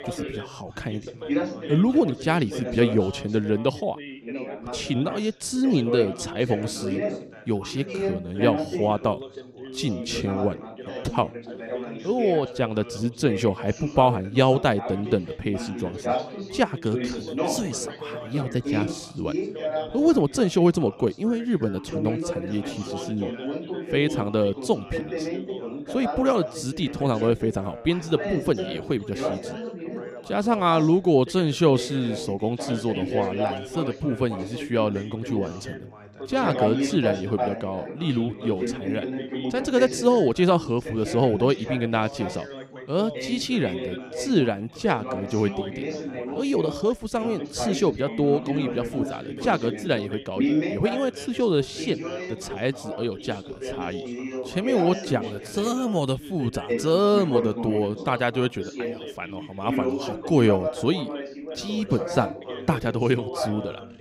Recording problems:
background chatter; loud; throughout; 3 voices, 7 dB below the speech

